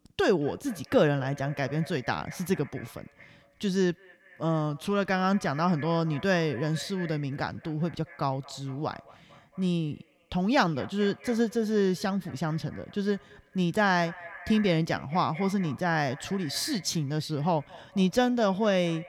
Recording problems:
echo of what is said; faint; throughout; 220 ms later, 20 dB below the speech

